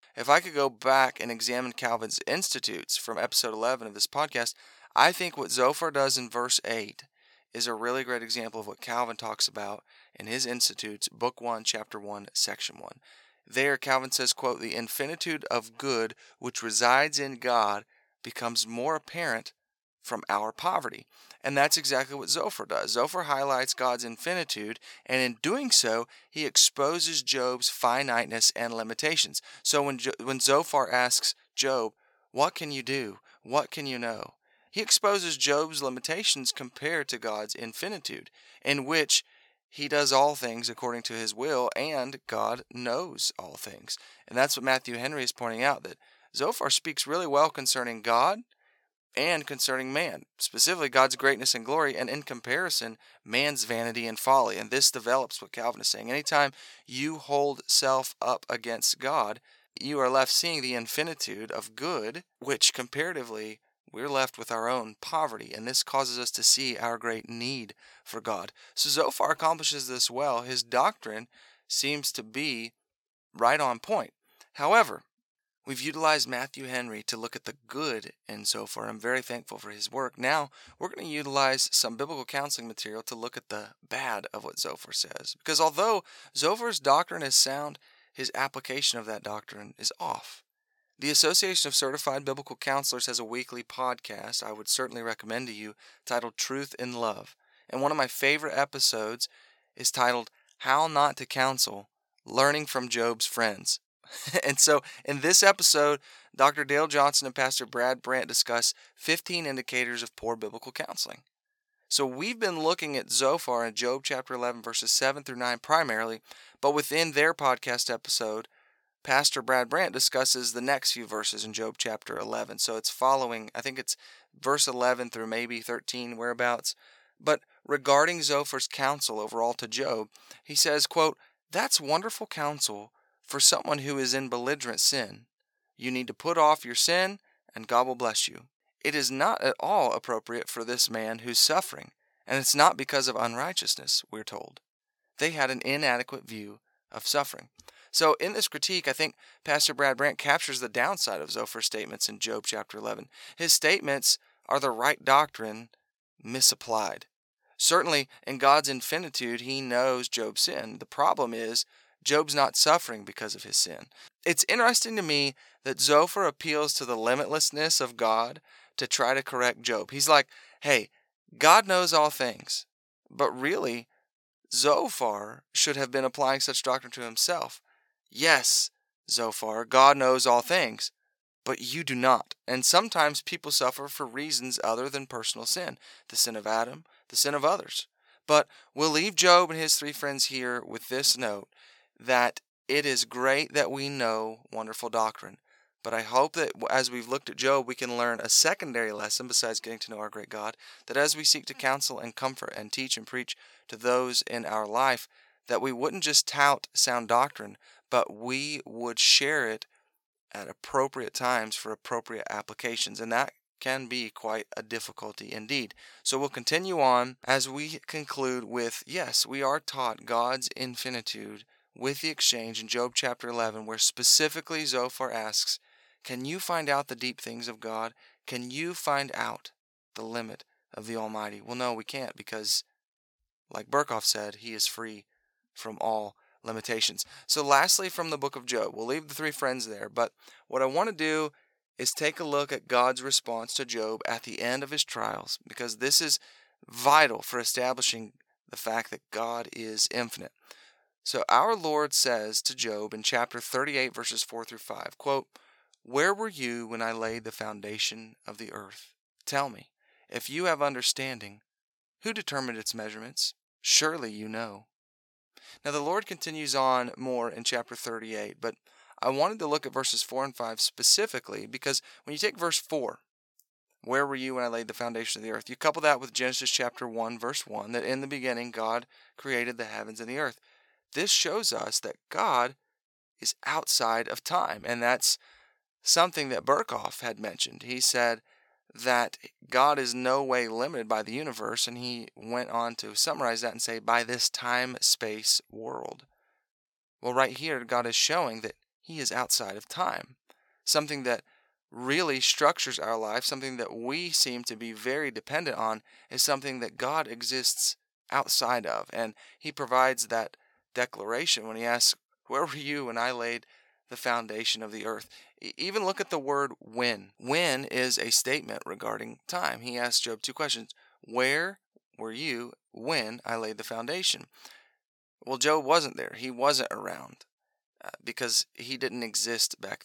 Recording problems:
thin; somewhat; fading below 1 kHz

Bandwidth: 17.5 kHz